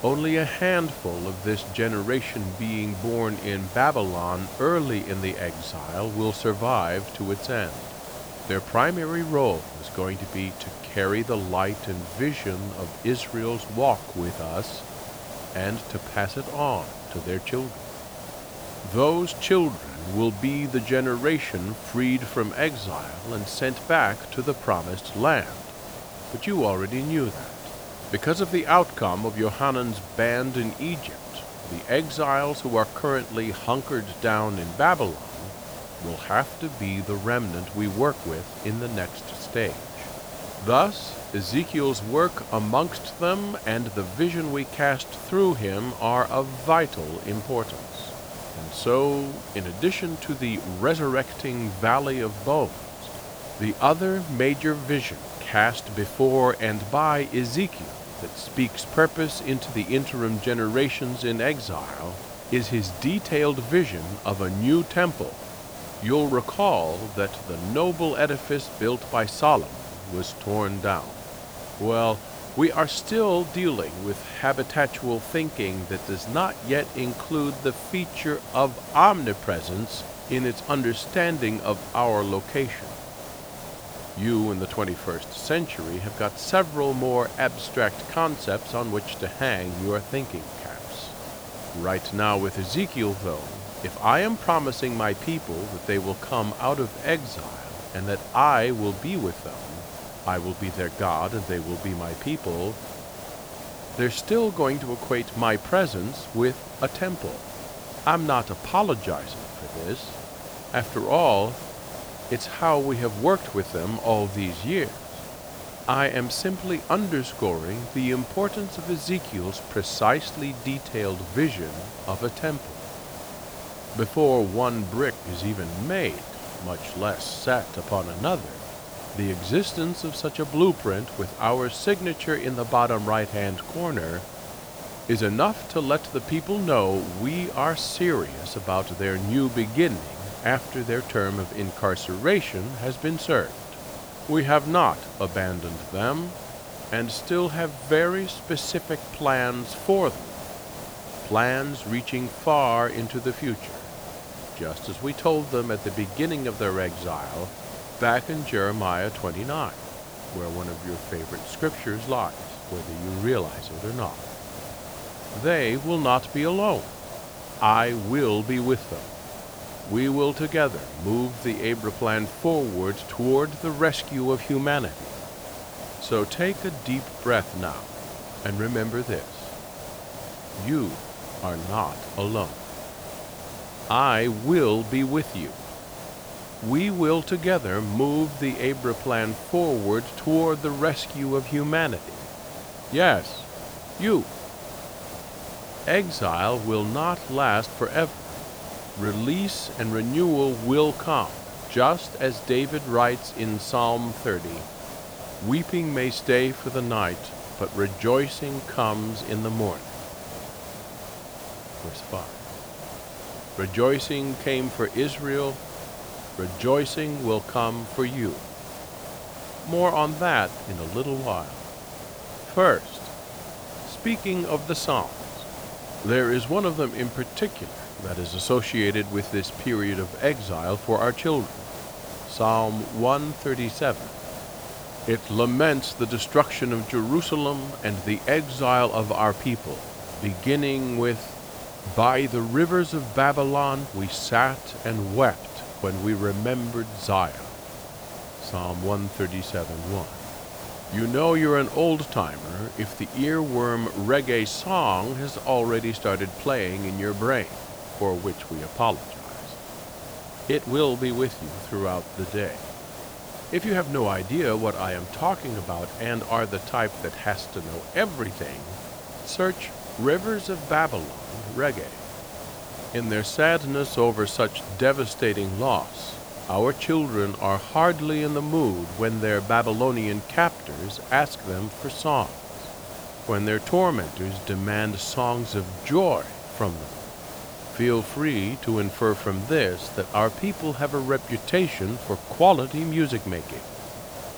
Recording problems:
hiss; noticeable; throughout; 10 dB below the speech

